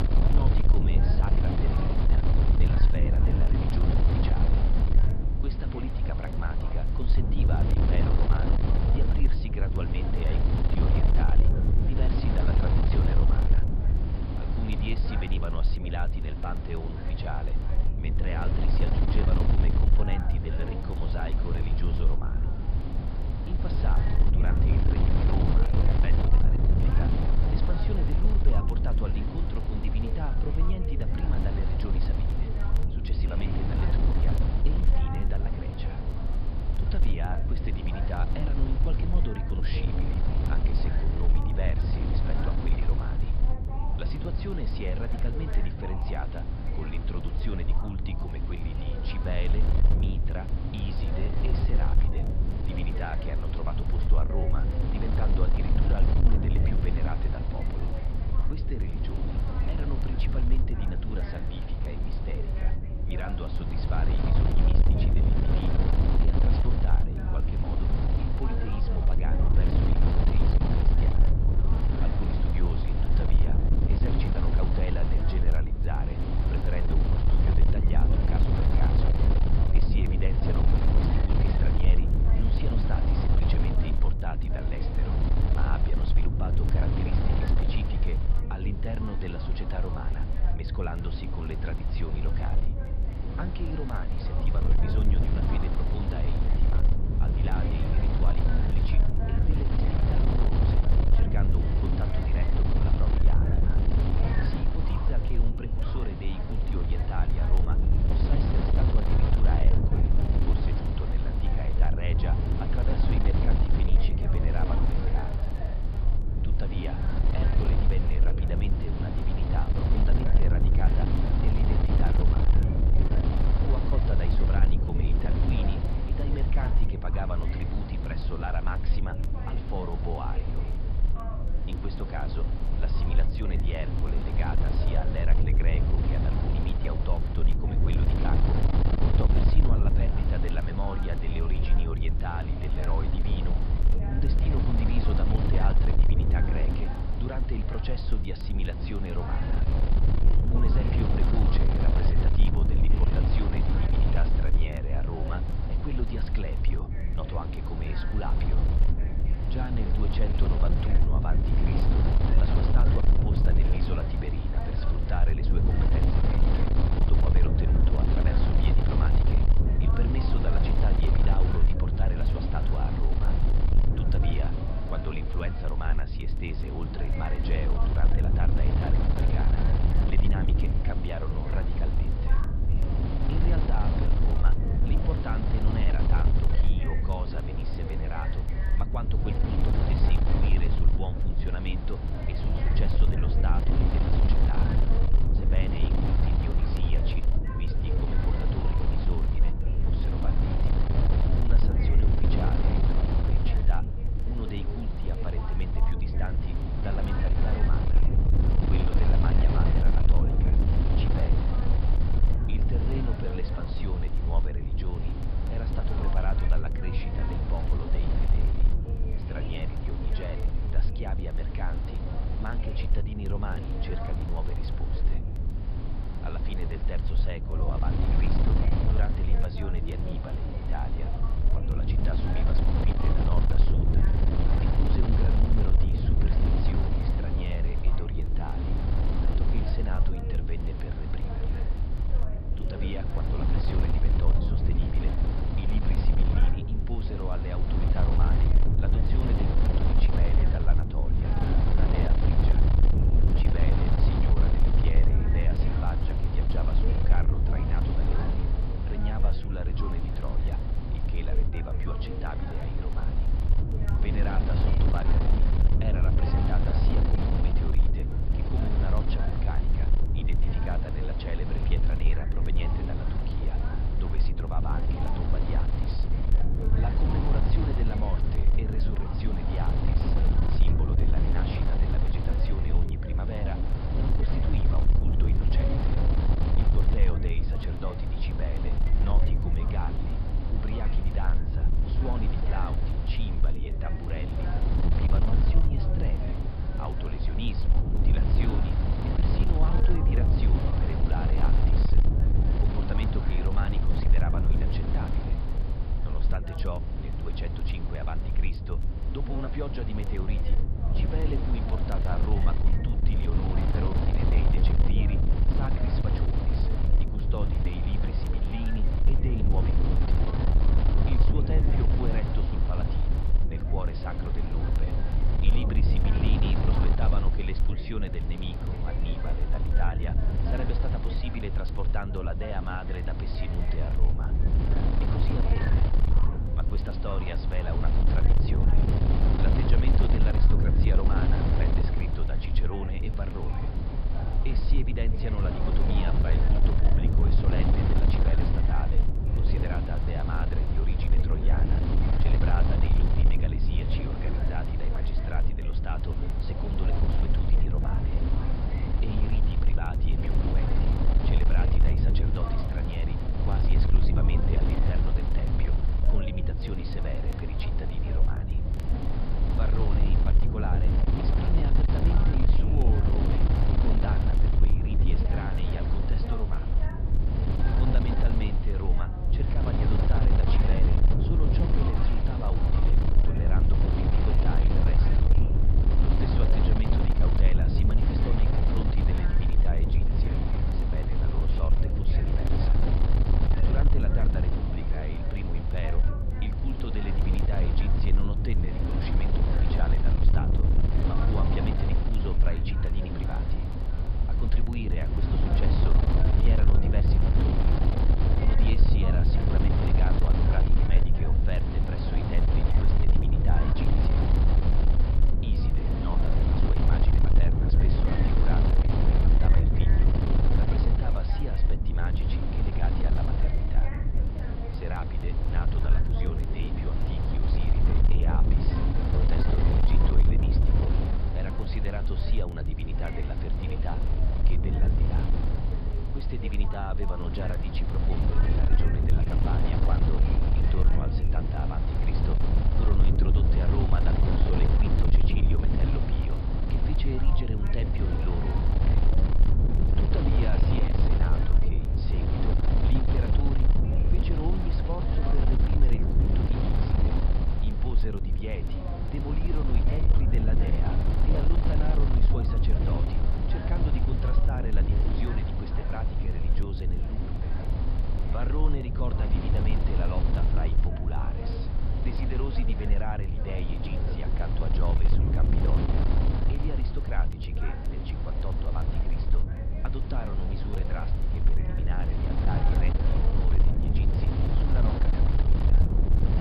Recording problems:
high frequencies cut off; noticeable; nothing above 5 kHz
wind noise on the microphone; heavy; 2 dB above the speech
voice in the background; loud; throughout; 9 dB below the speech
crackle, like an old record; faint; 25 dB below the speech

